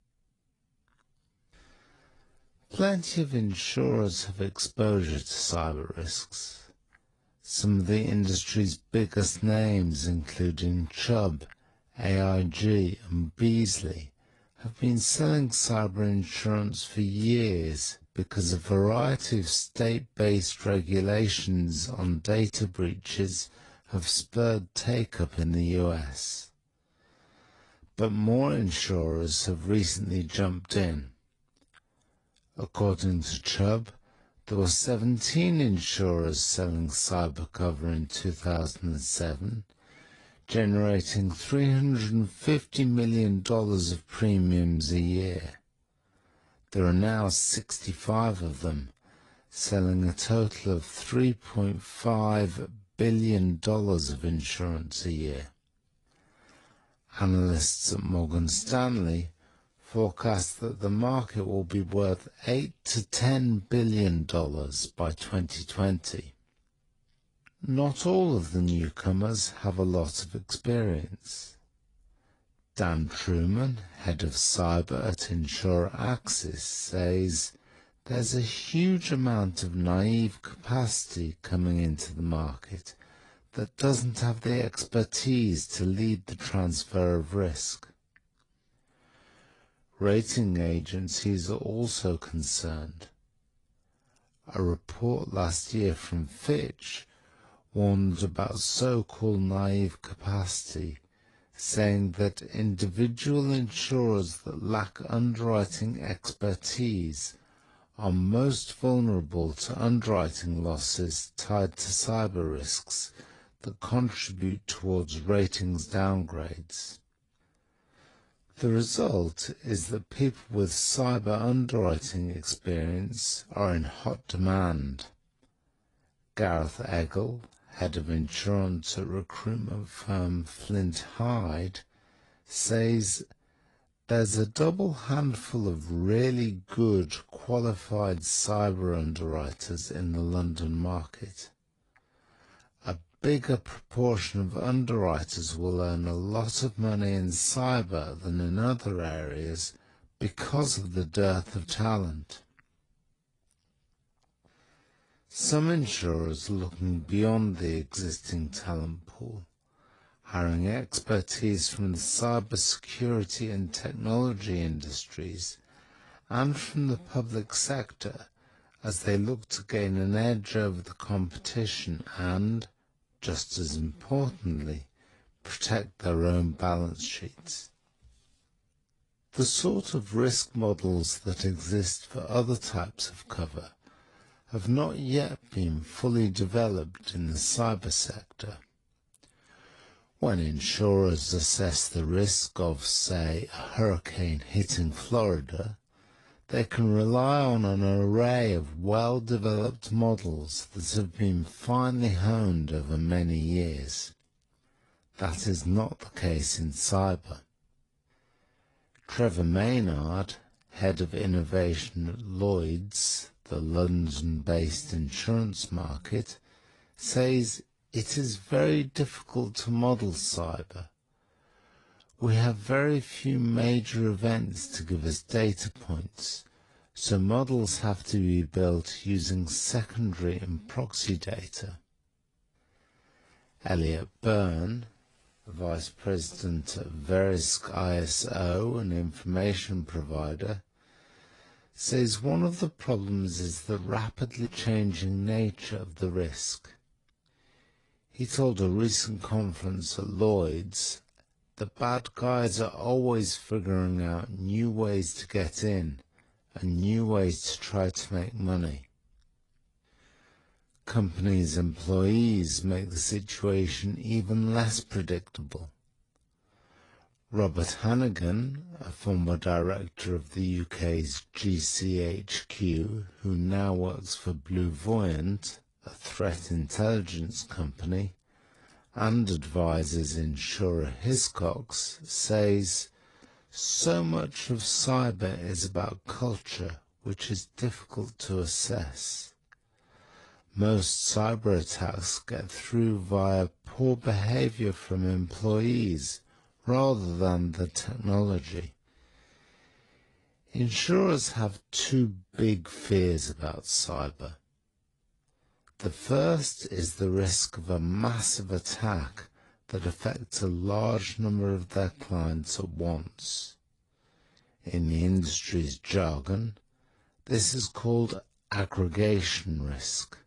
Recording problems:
wrong speed, natural pitch; too slow; 0.6 times normal speed
garbled, watery; slightly

